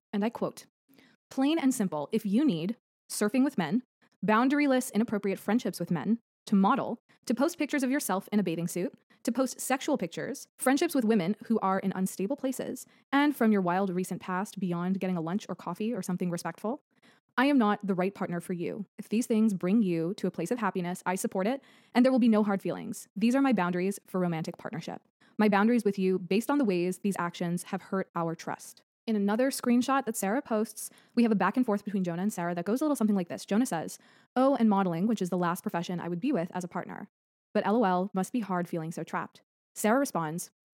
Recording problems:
wrong speed, natural pitch; too fast; 1.5 times normal speed

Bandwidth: 16.5 kHz